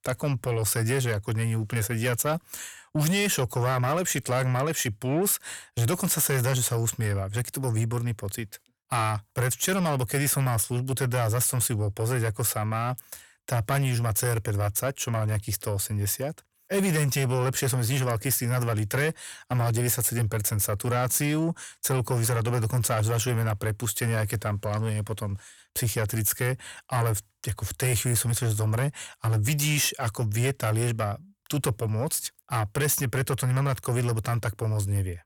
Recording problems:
distortion; slight; 10 dB below the speech

